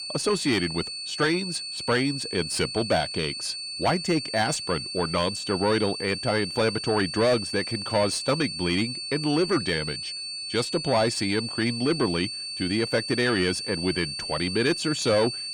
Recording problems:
distortion; slight; 10 dB below the speech
high-pitched whine; loud; throughout; 4.5 kHz, 5 dB below the speech

